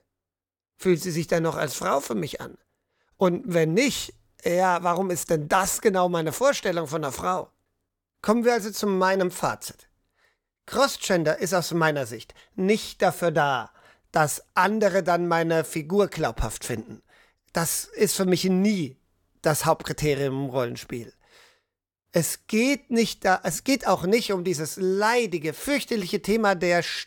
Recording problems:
none

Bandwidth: 17.5 kHz